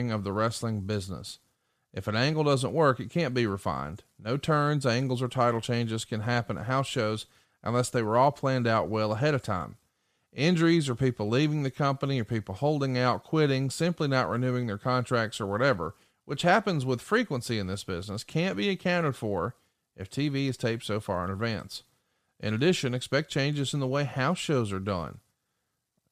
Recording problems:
abrupt cut into speech; at the start

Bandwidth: 14.5 kHz